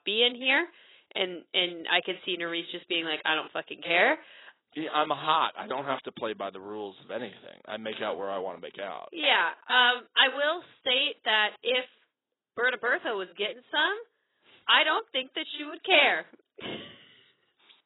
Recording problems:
garbled, watery; badly; nothing above 4 kHz
thin; somewhat; fading below 400 Hz

